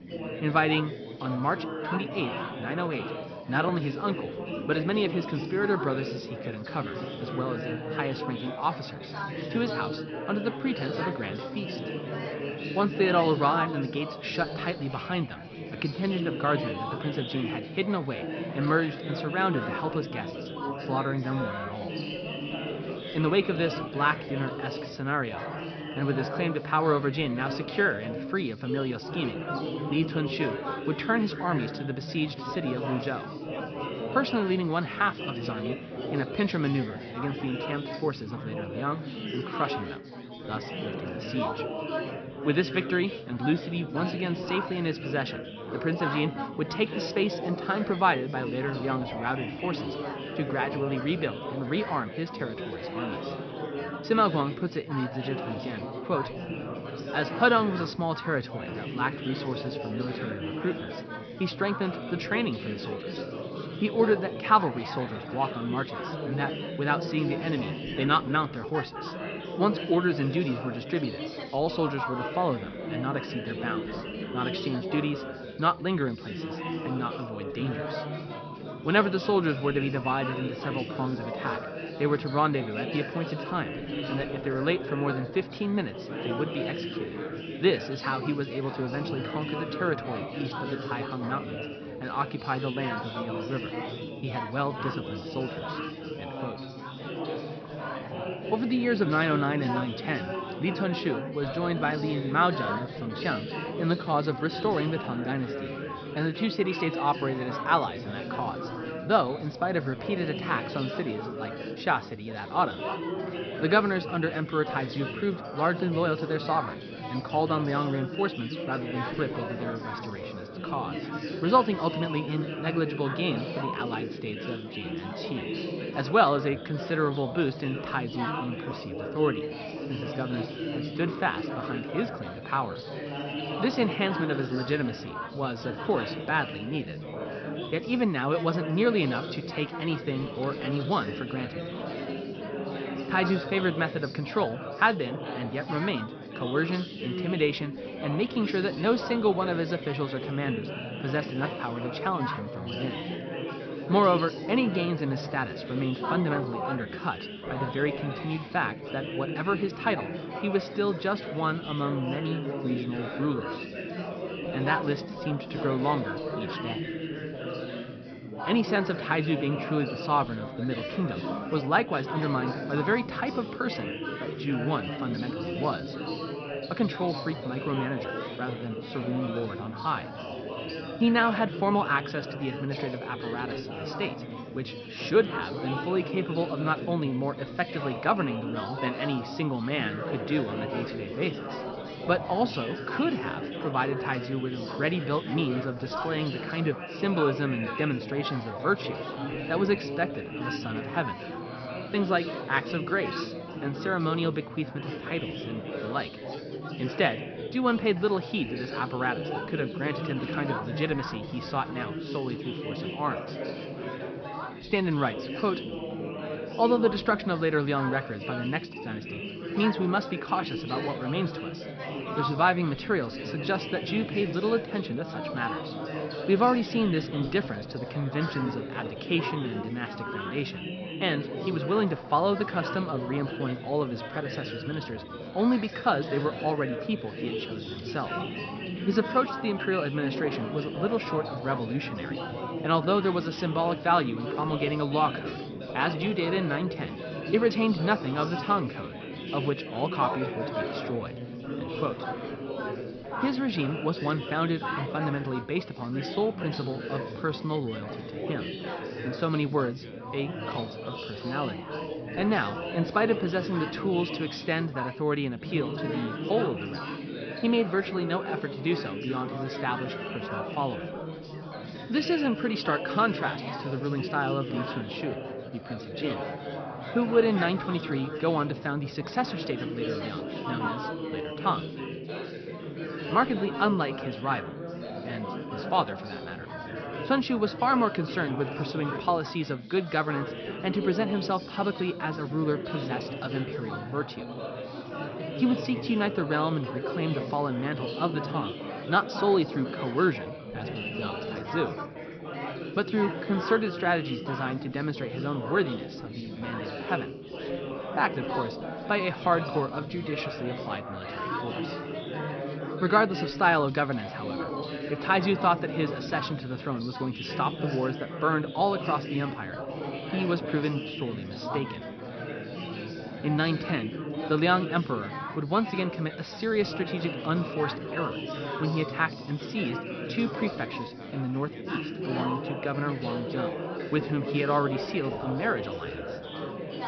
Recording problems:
high frequencies cut off; noticeable; nothing above 5.5 kHz
chatter from many people; loud; throughout; 6 dB below the speech

